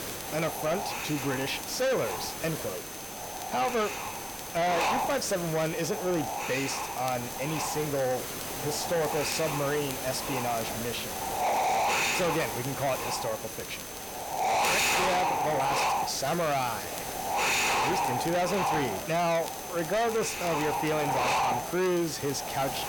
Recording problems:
distortion; heavy; 7 dB below the speech
wind noise on the microphone; heavy; 1 dB above the speech
hiss; loud; throughout; 7 dB below the speech
high-pitched whine; noticeable; throughout; 6 kHz, 15 dB below the speech
crackle, like an old record; noticeable; 20 dB below the speech

